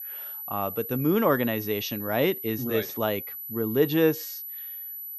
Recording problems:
high-pitched whine; loud; throughout; 12 kHz, 8 dB below the speech

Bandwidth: 14 kHz